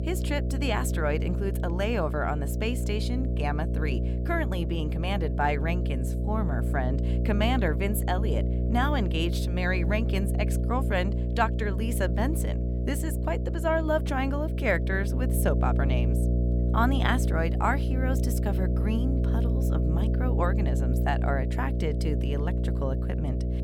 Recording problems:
electrical hum; loud; throughout; 60 Hz, 8 dB below the speech

